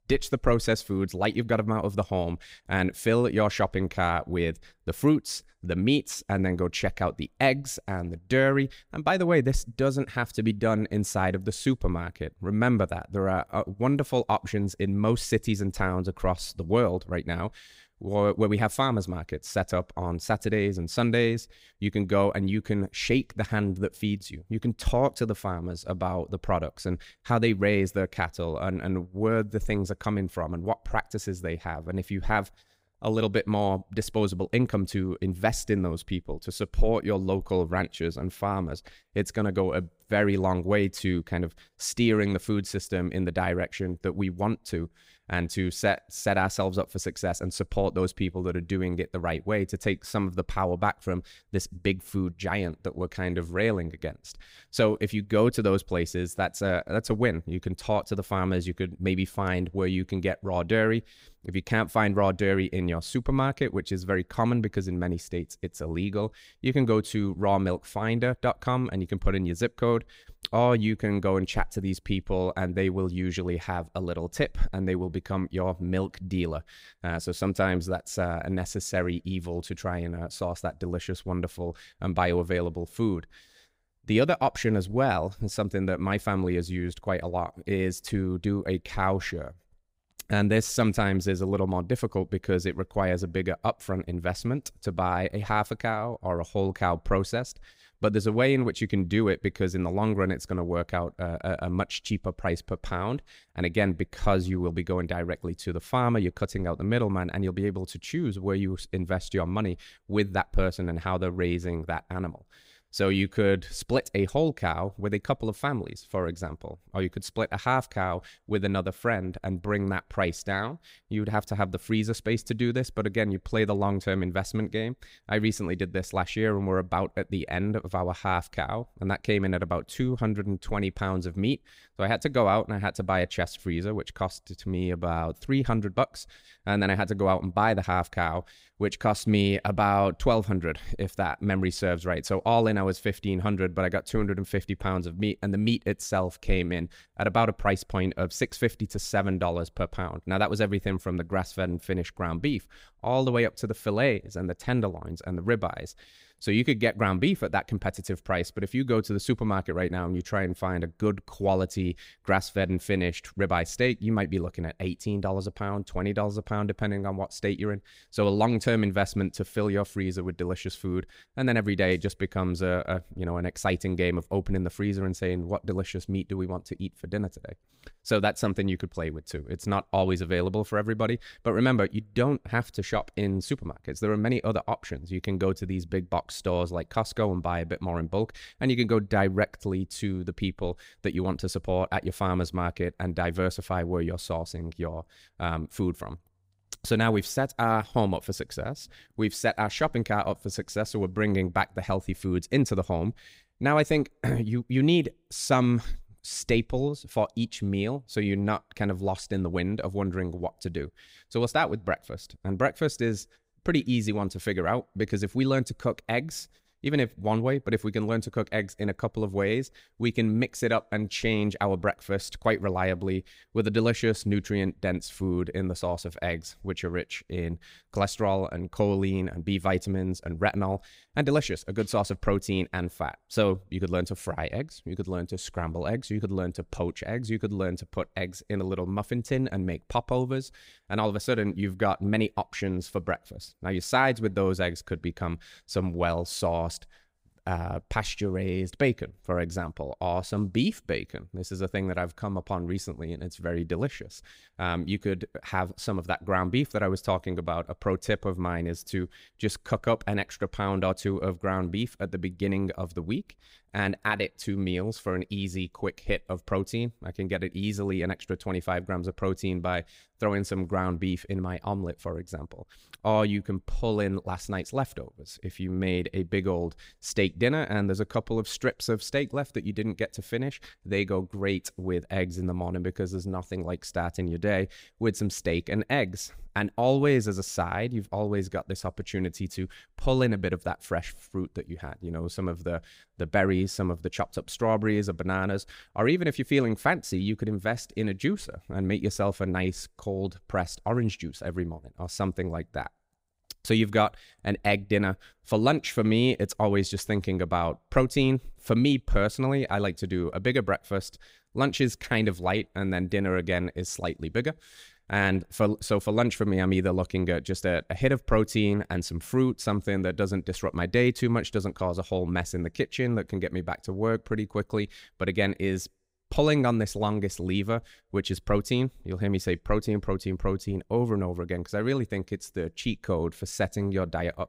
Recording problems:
none

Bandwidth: 15.5 kHz